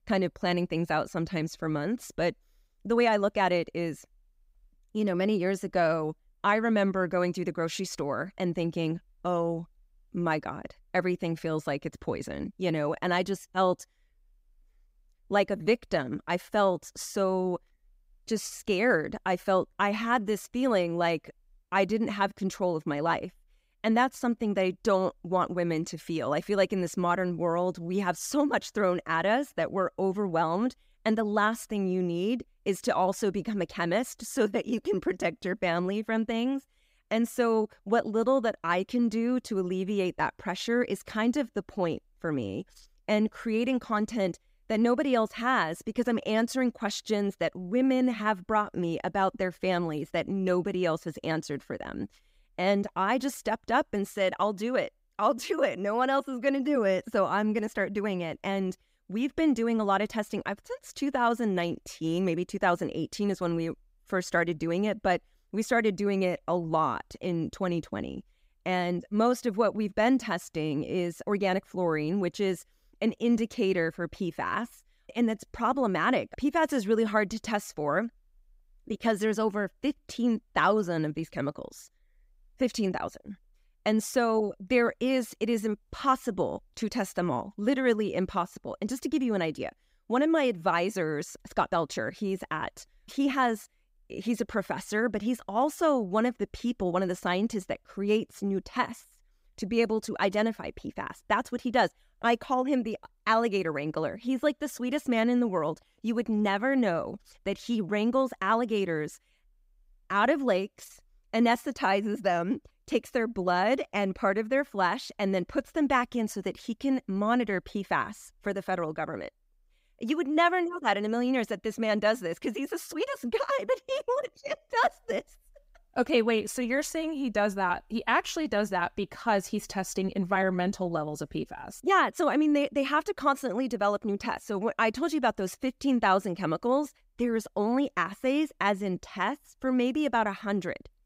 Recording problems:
none

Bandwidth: 15.5 kHz